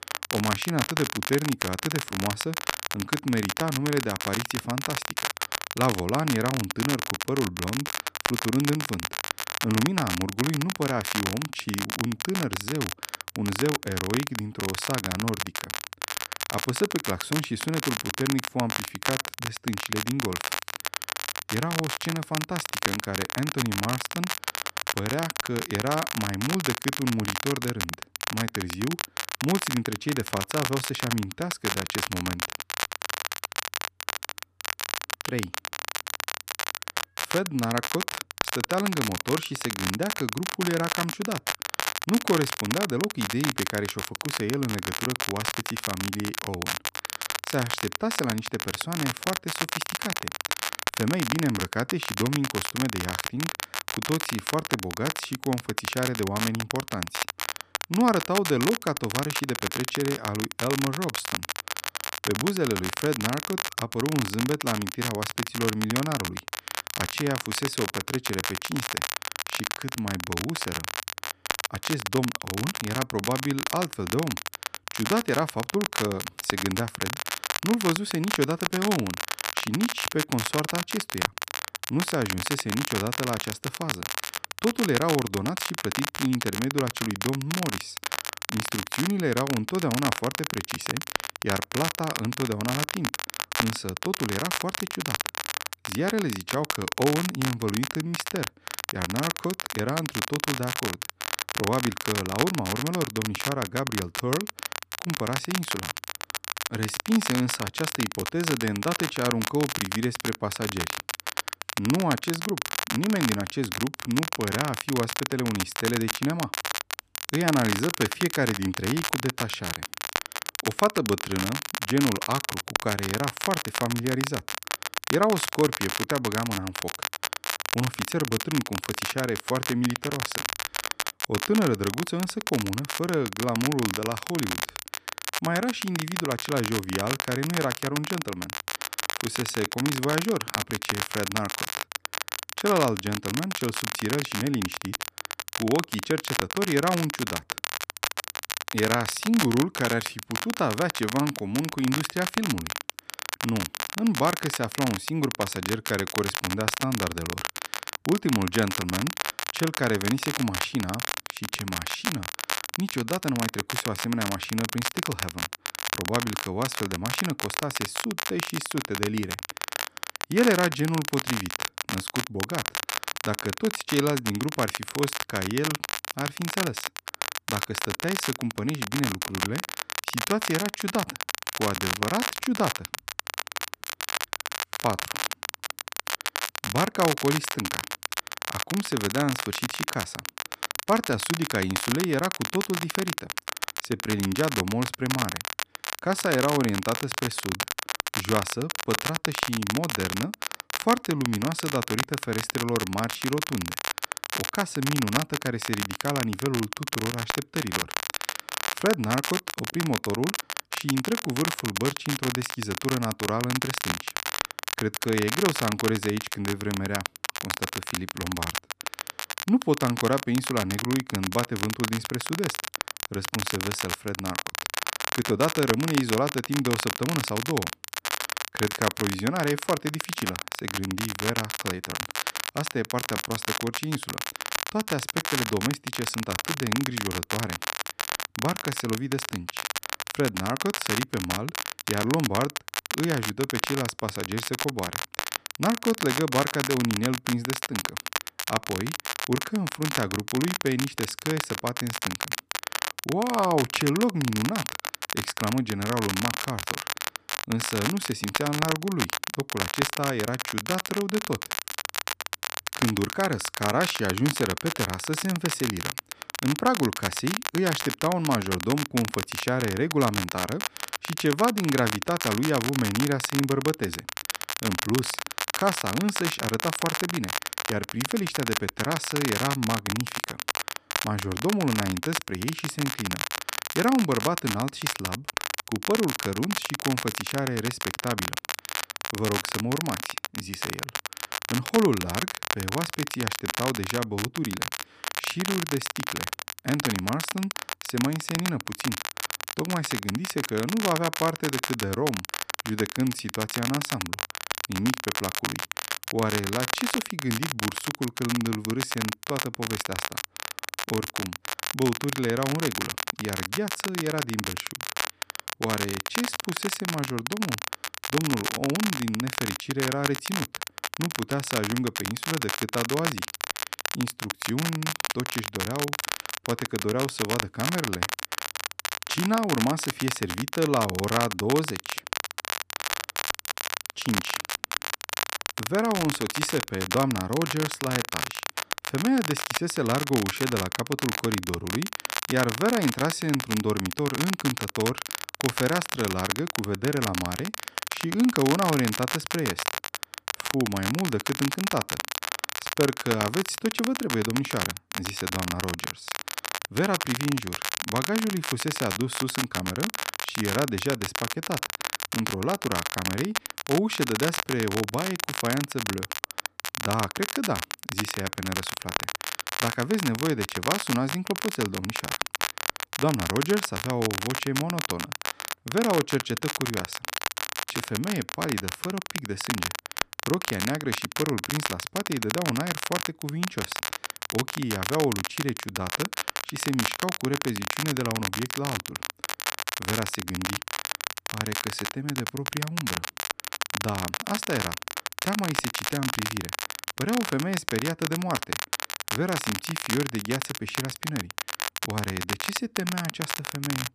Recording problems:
crackle, like an old record; loud; 1 dB below the speech

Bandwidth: 14.5 kHz